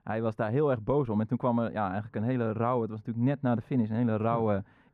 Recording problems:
muffled; very; fading above 2.5 kHz

